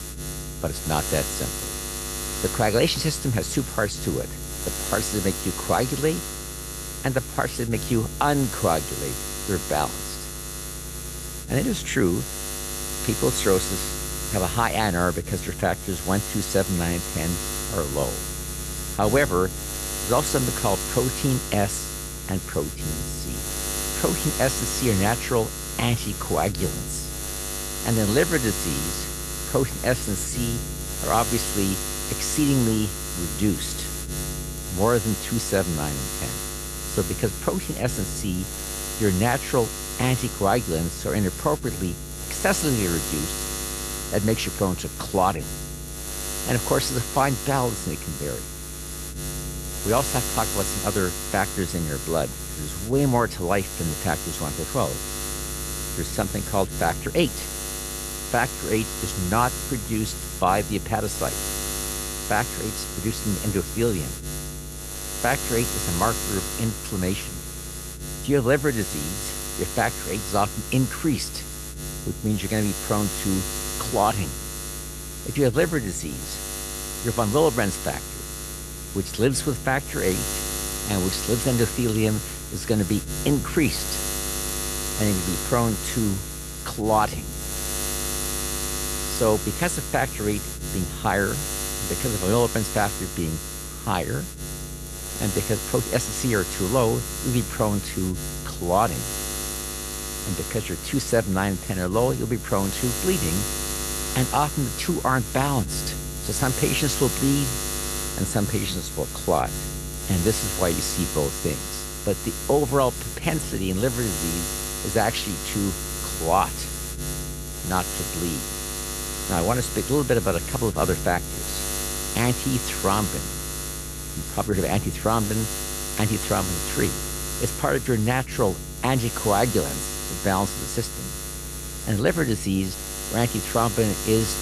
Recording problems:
electrical hum; loud; throughout; 60 Hz, 5 dB below the speech

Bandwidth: 13.5 kHz